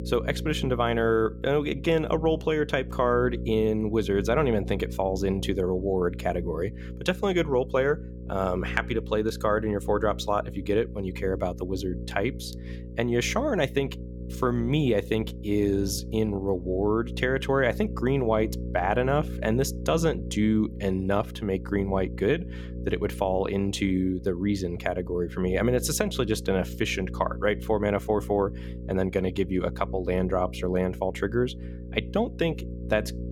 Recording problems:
electrical hum; noticeable; throughout; 60 Hz, 15 dB below the speech

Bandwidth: 18 kHz